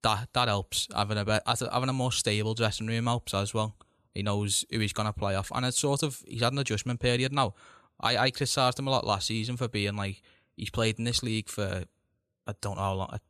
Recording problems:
none

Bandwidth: 13.5 kHz